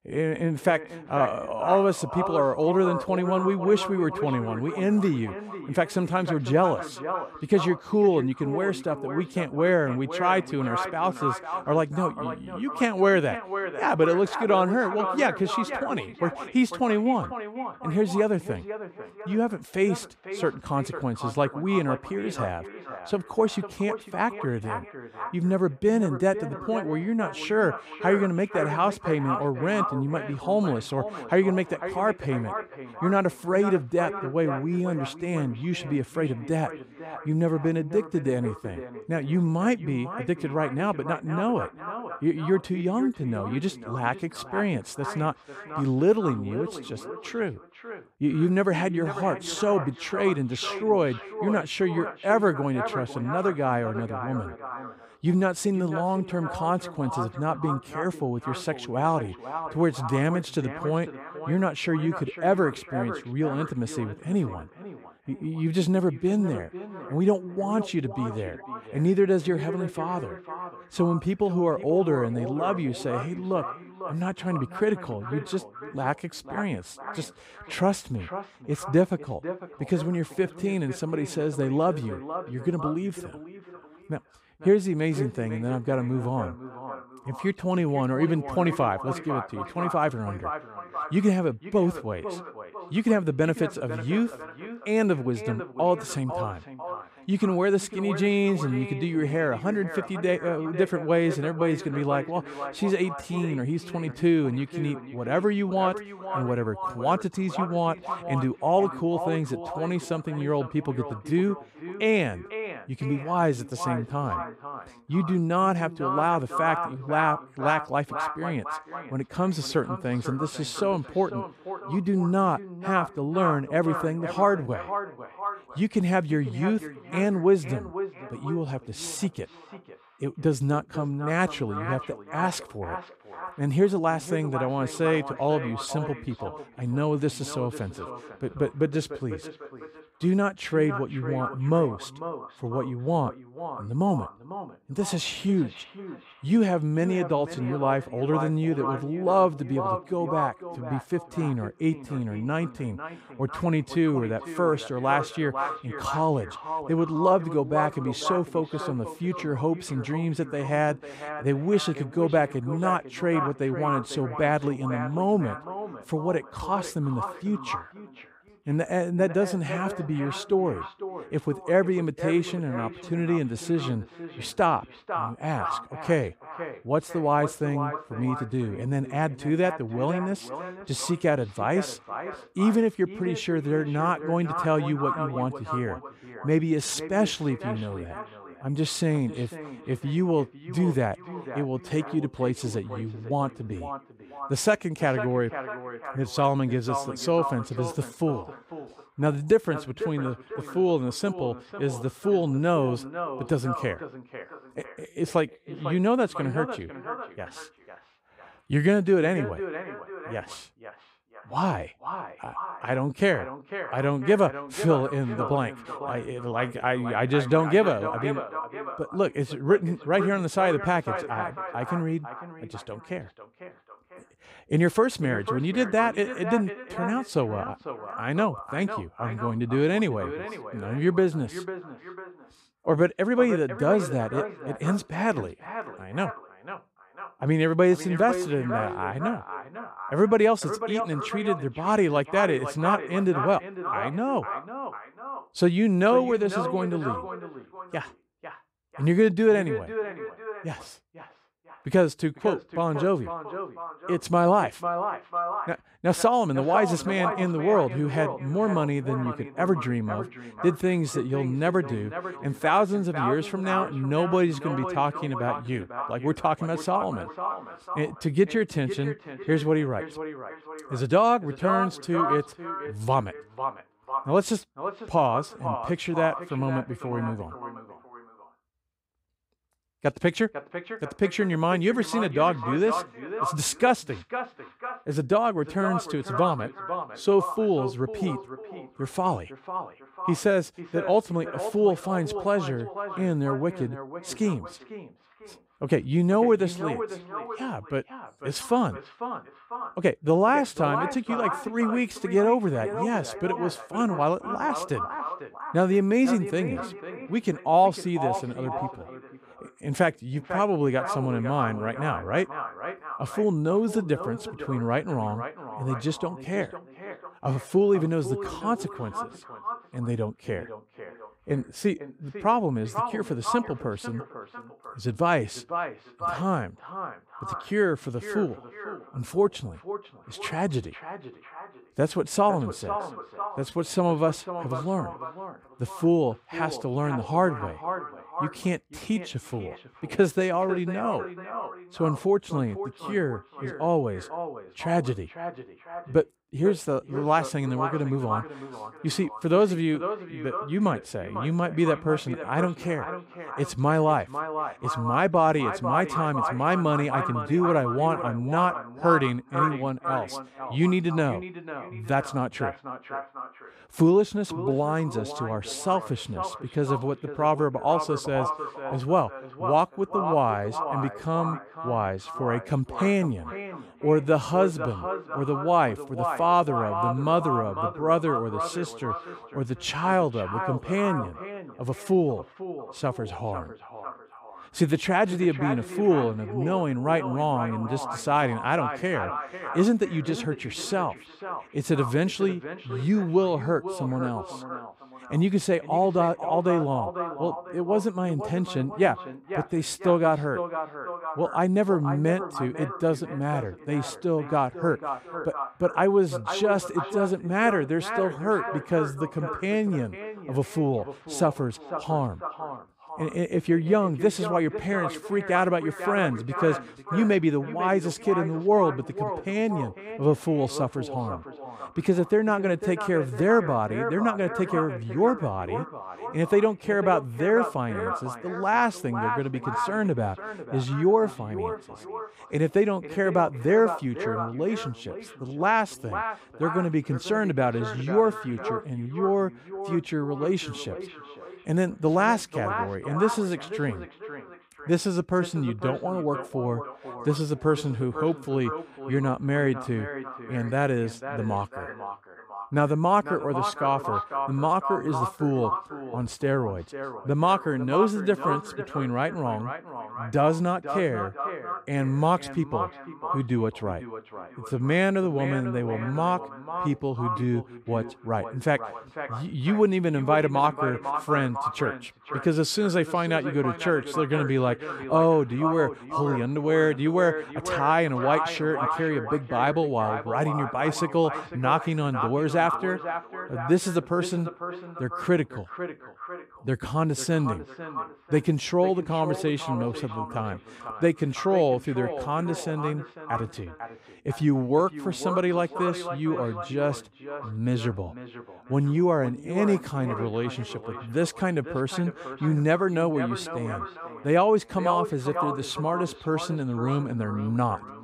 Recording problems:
echo of what is said; strong; throughout; 500 ms later, 9 dB below the speech

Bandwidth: 15.5 kHz